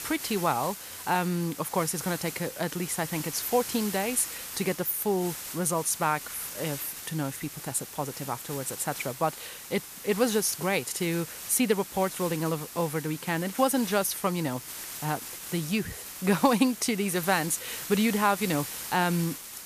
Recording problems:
hiss; loud; throughout; 9 dB below the speech

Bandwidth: 14.5 kHz